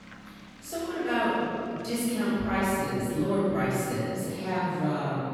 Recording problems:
room echo; strong; dies away in 2.5 s
off-mic speech; far
traffic noise; faint; until 3 s; 20 dB below the speech

